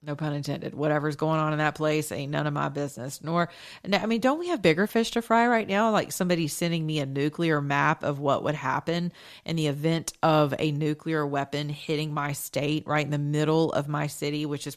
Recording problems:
none

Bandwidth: 14 kHz